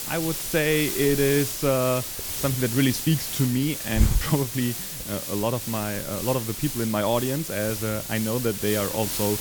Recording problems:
hiss; loud; throughout; 3 dB below the speech

